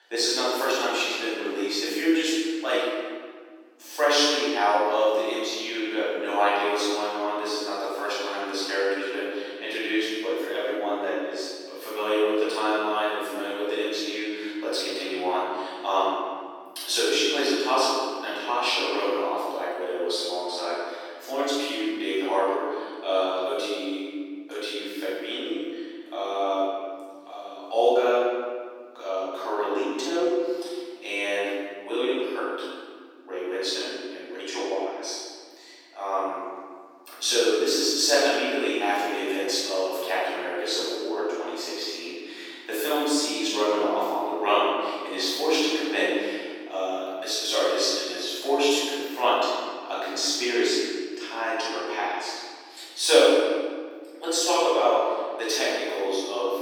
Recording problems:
room echo; strong; dies away in 1.6 s
off-mic speech; far
thin; somewhat; fading below 300 Hz

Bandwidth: 17.5 kHz